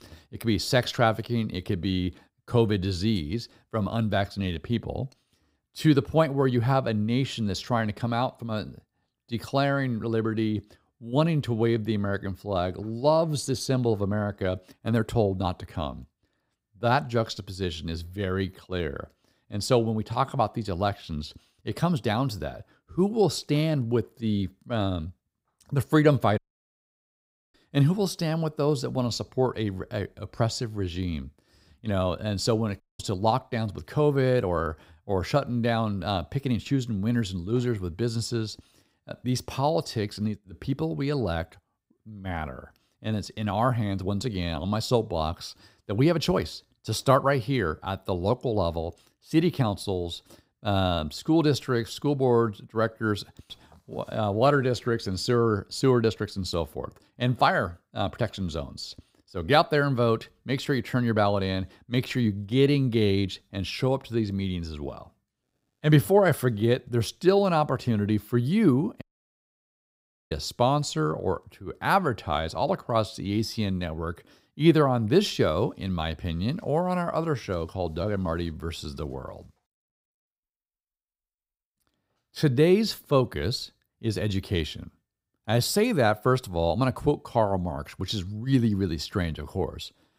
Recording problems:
audio cutting out; at 26 s for 1 s, at 33 s and at 1:09 for 1.5 s

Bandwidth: 15.5 kHz